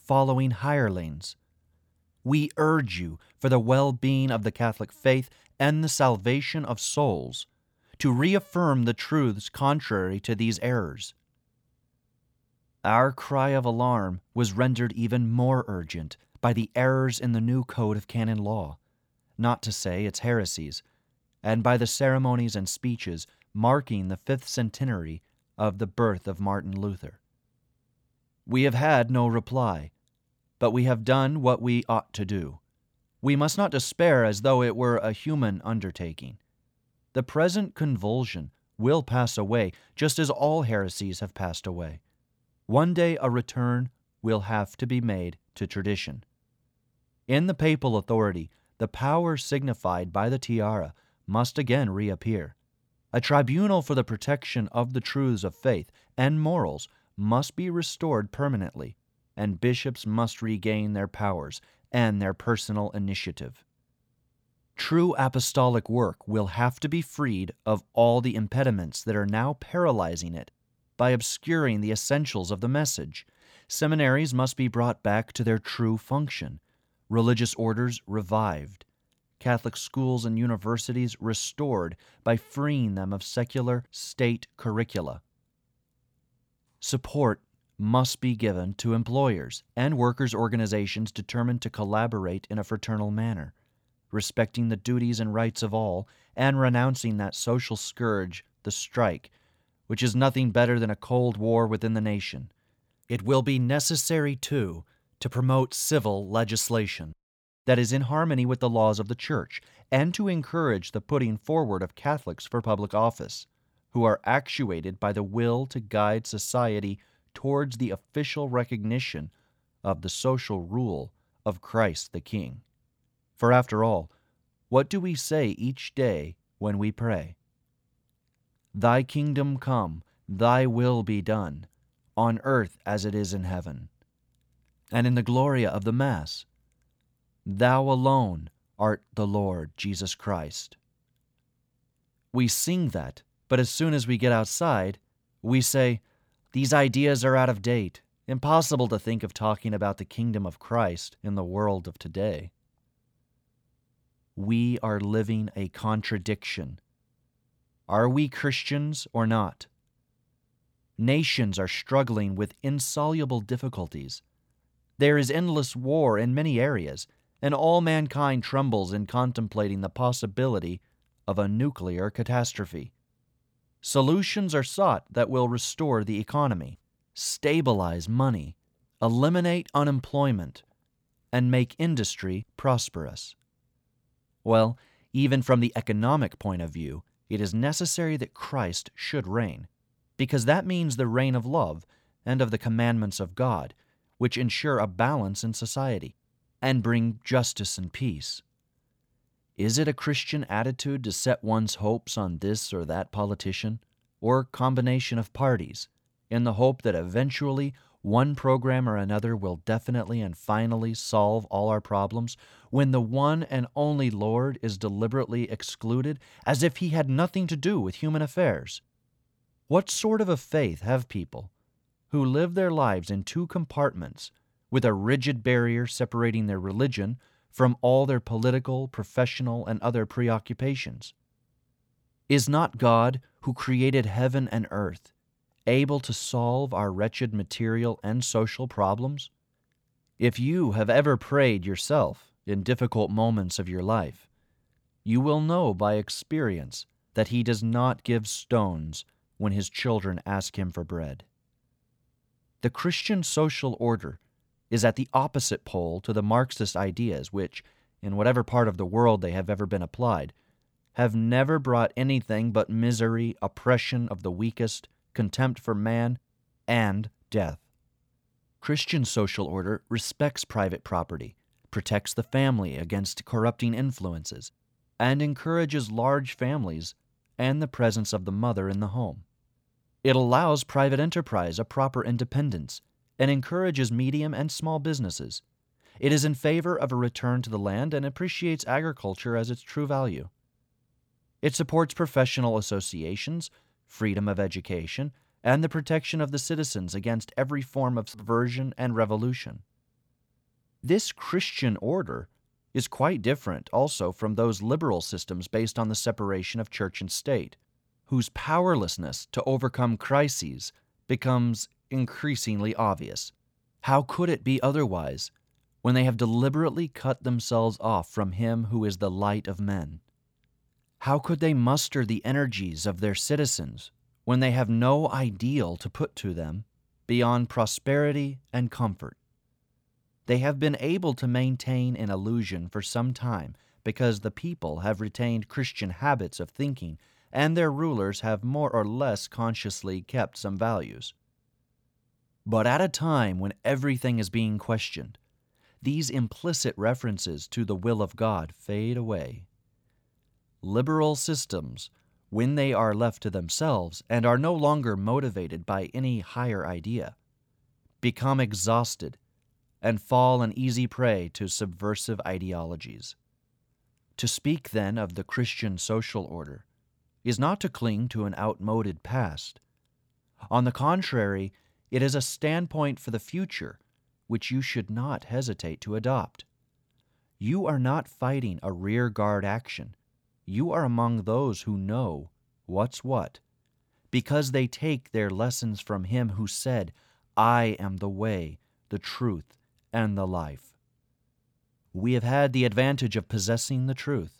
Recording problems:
none

